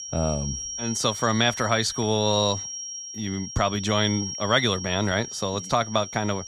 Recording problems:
high-pitched whine; loud; throughout; 5.5 kHz, 8 dB below the speech

